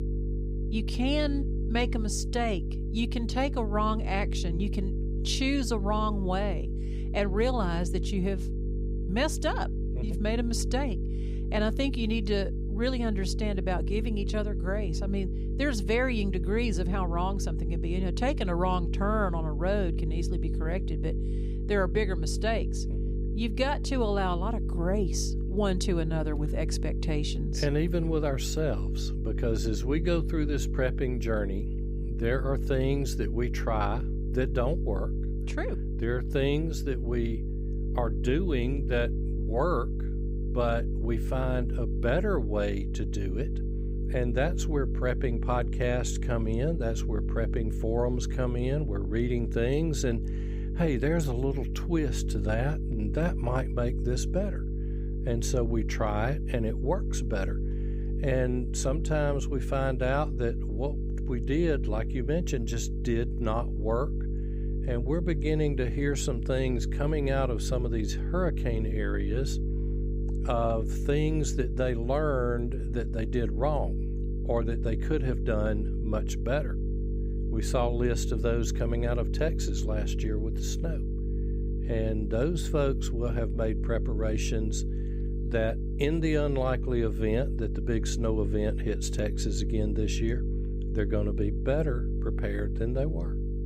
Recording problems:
electrical hum; noticeable; throughout; 50 Hz, 10 dB below the speech

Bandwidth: 15.5 kHz